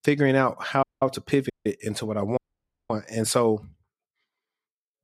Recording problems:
audio cutting out; at 1 s, at 1.5 s and at 2.5 s for 0.5 s

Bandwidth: 14.5 kHz